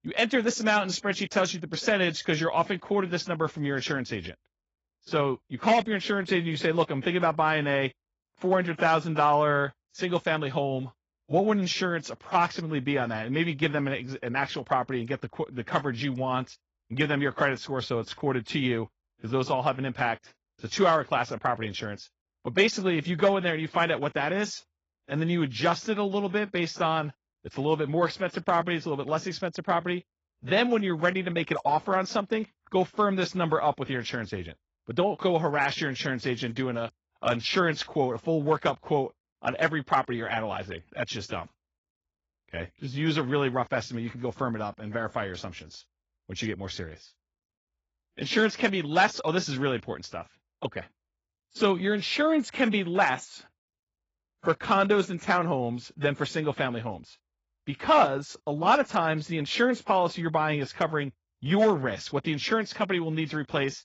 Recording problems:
garbled, watery; badly; nothing above 7 kHz

